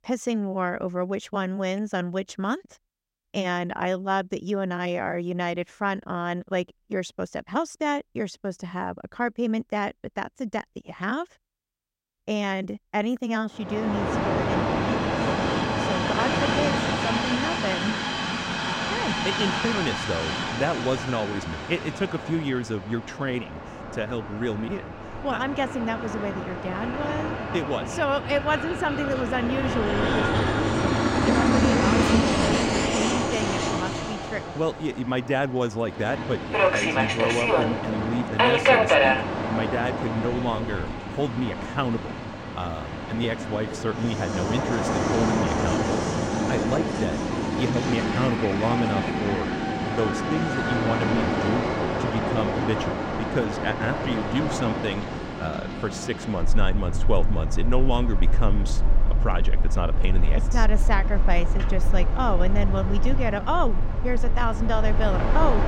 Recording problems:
train or aircraft noise; very loud; from 14 s on; 3 dB above the speech

